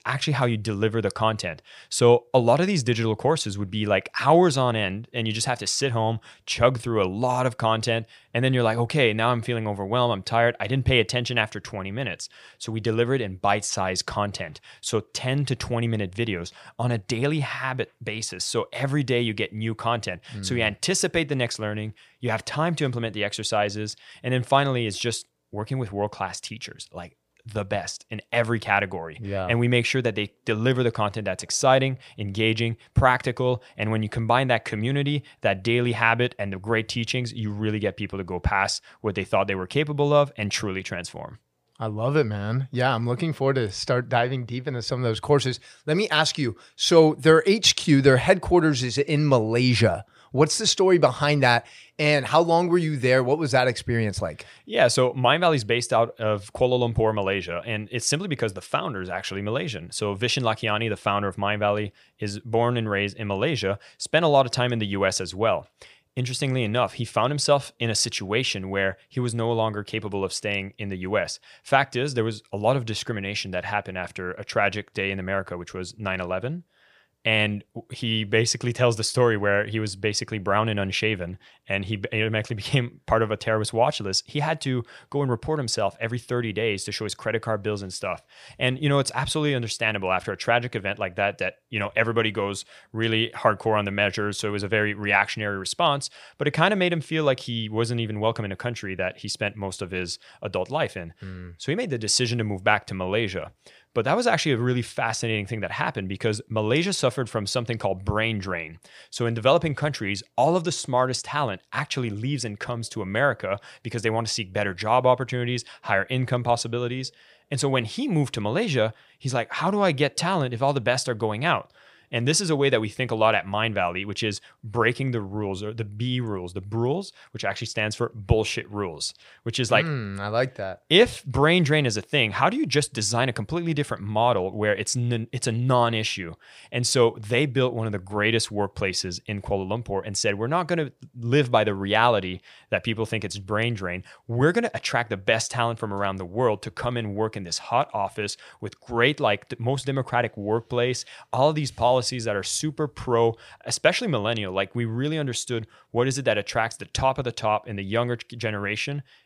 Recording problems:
none

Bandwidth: 15 kHz